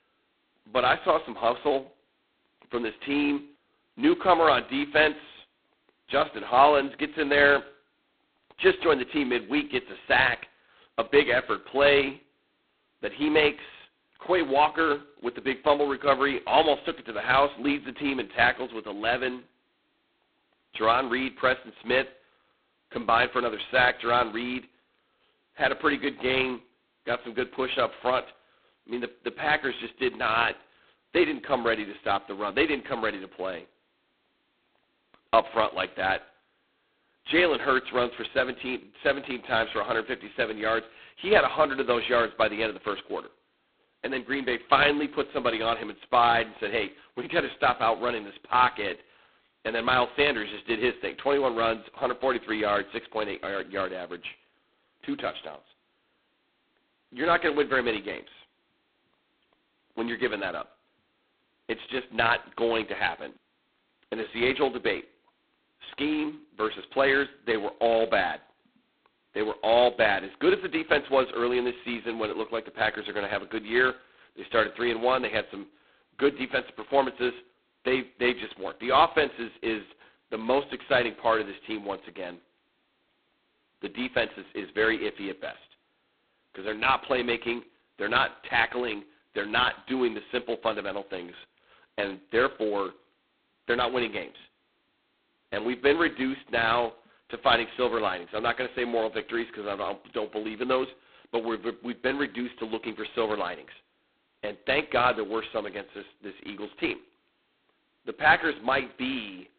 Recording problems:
phone-call audio; poor line; nothing above 4 kHz

